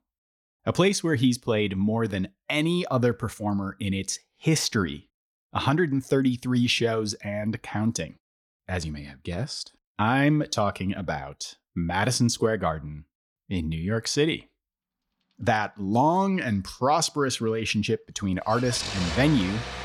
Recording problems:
traffic noise; loud; from 16 s on; 7 dB below the speech

